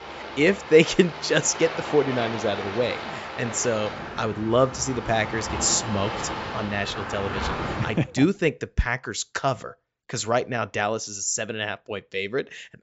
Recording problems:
high frequencies cut off; noticeable; nothing above 8 kHz
rain or running water; loud; until 8 s; 8 dB below the speech

